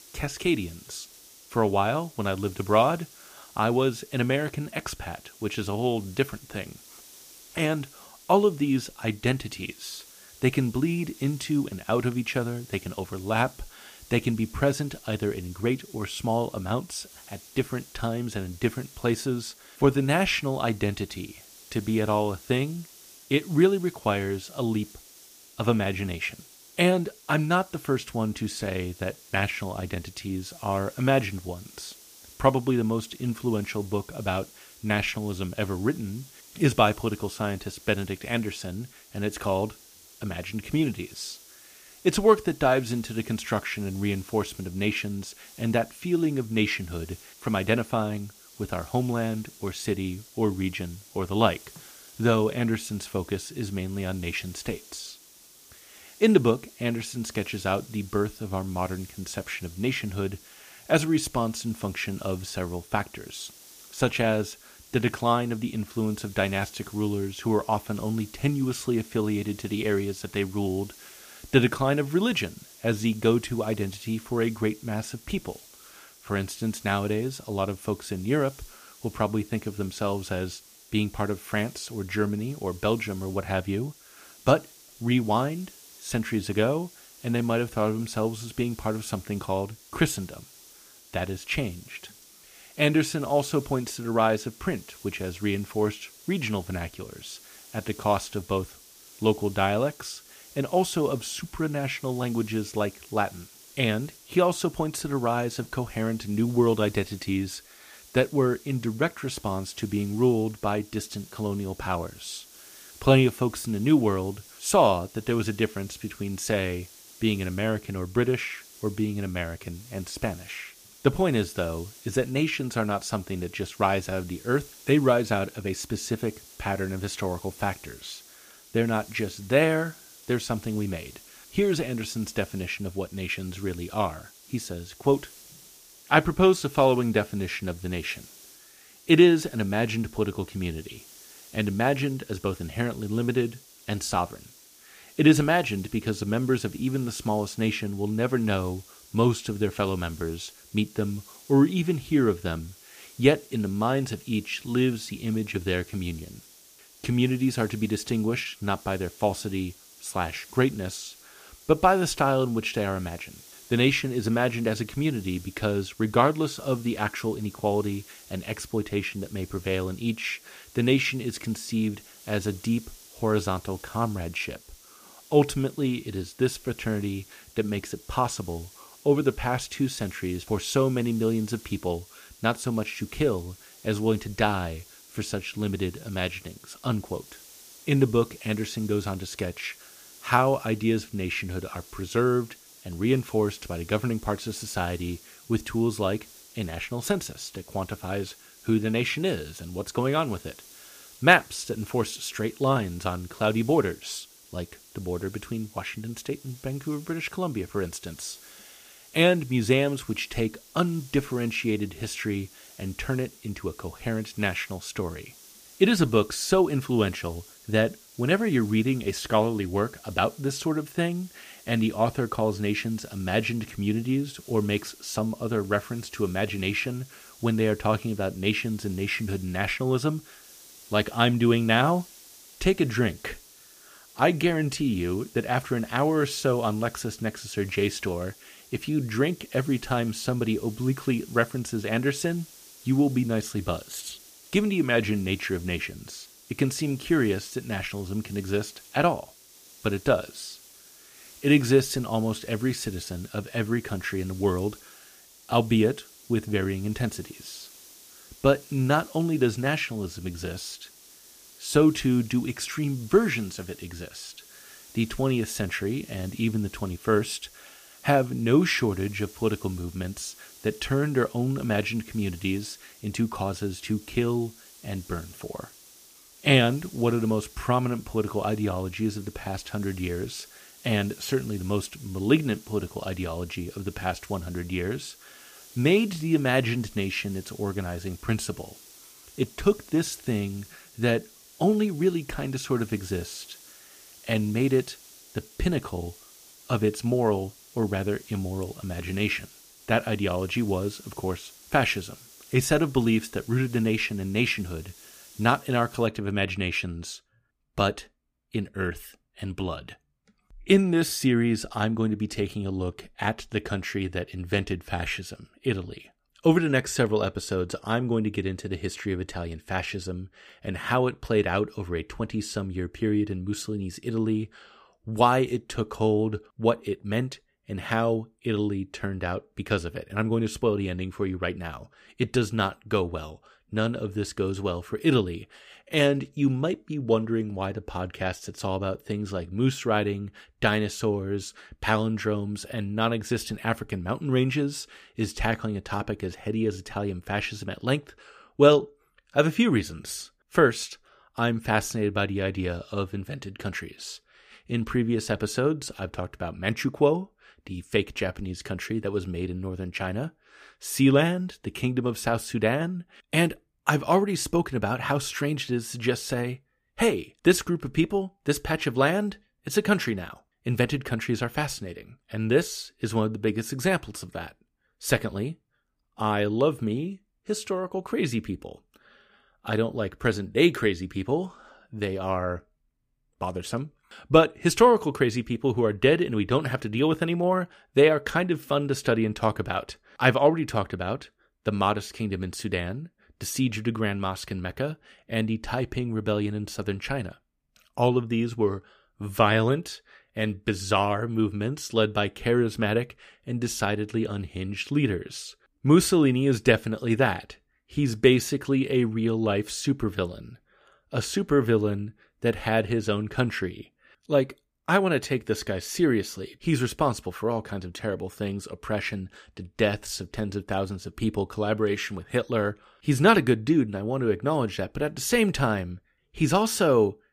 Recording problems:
hiss; faint; until 5:06; 20 dB below the speech

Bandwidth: 15 kHz